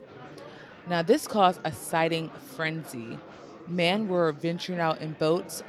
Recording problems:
murmuring crowd; noticeable; throughout; 20 dB below the speech

